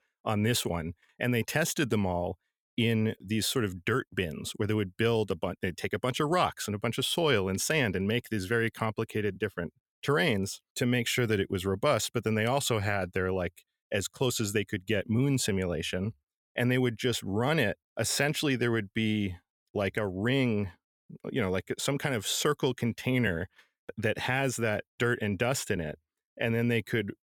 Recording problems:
none

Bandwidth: 17 kHz